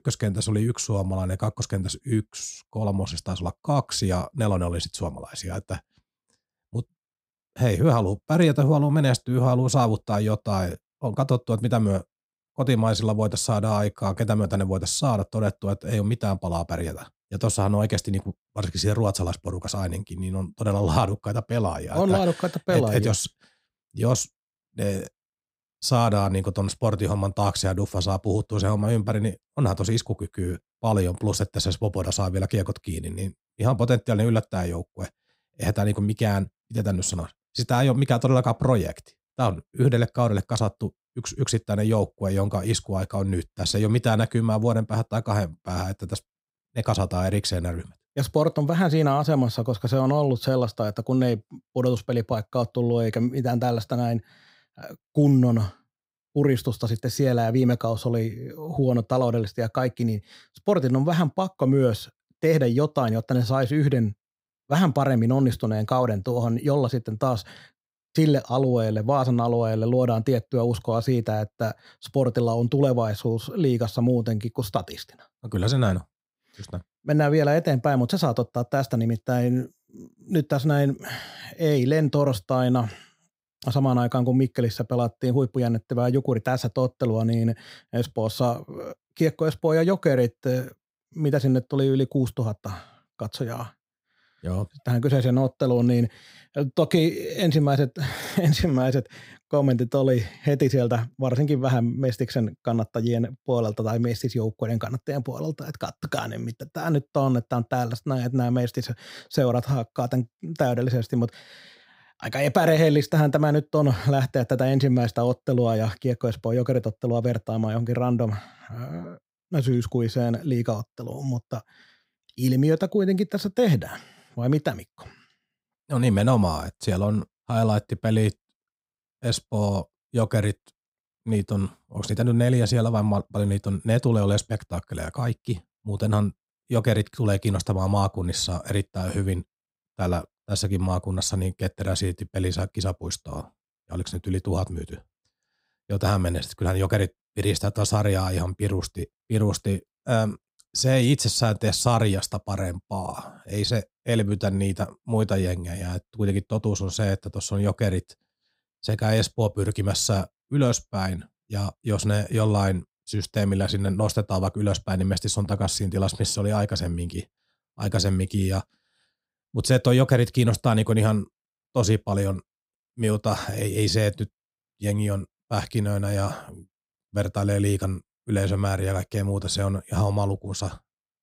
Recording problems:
muffled; slightly; fading above 3 kHz

